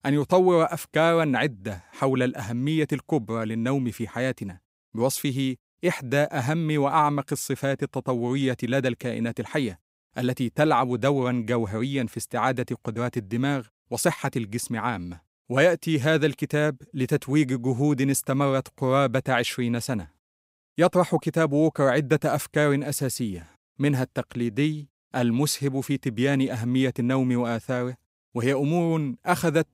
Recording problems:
none

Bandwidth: 15.5 kHz